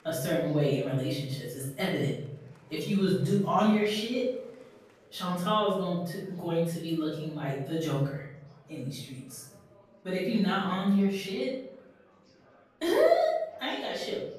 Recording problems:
off-mic speech; far
room echo; noticeable; dies away in 0.7 s
murmuring crowd; faint; throughout; 30 dB below the speech

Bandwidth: 14.5 kHz